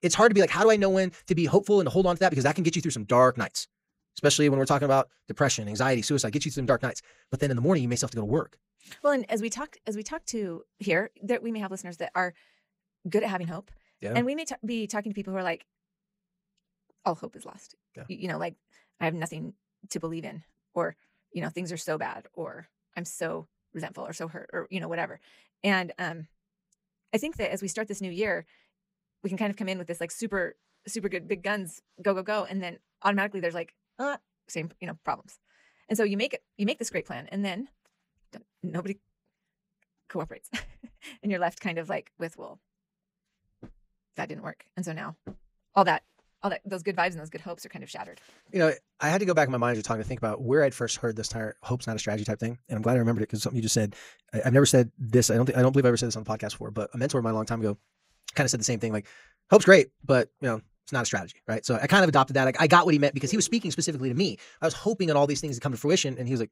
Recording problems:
wrong speed, natural pitch; too fast; 1.5 times normal speed

